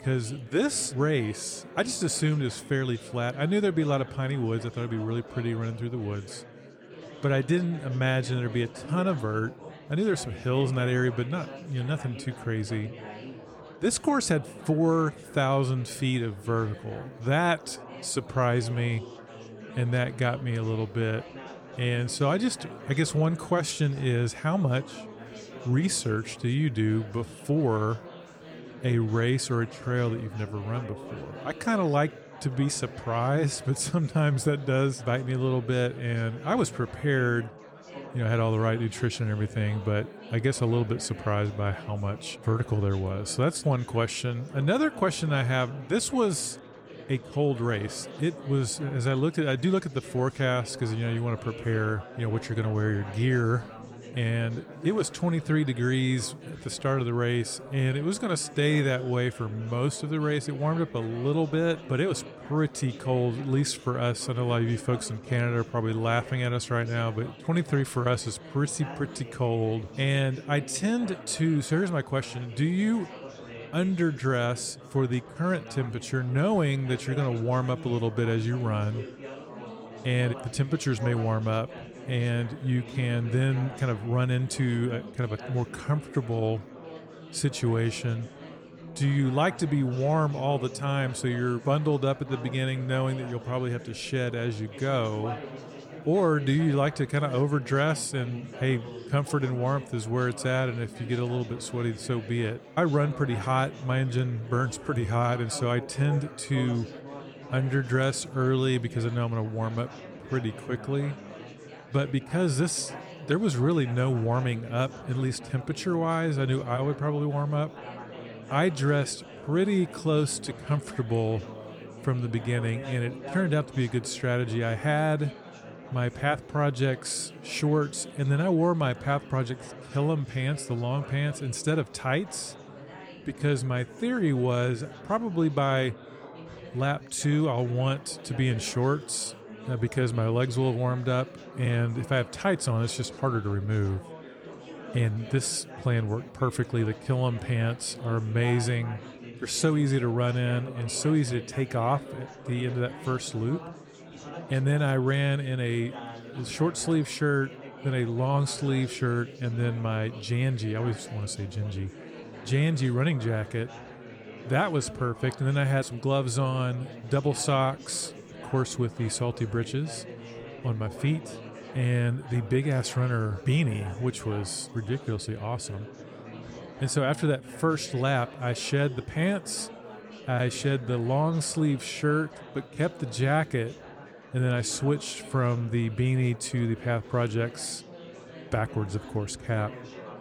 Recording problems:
chatter from many people; noticeable; throughout; 15 dB below the speech

